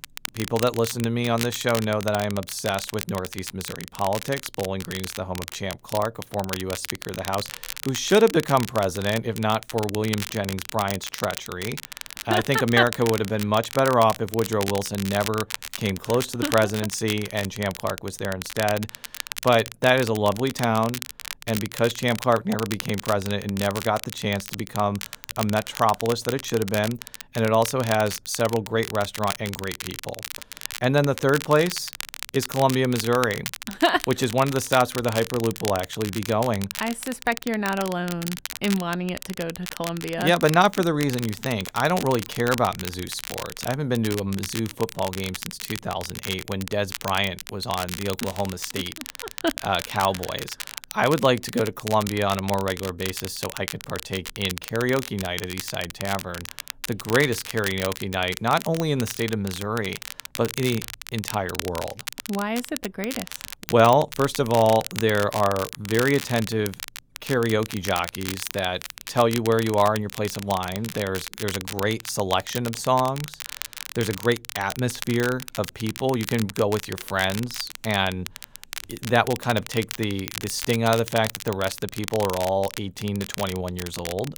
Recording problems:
crackle, like an old record; loud; 10 dB below the speech

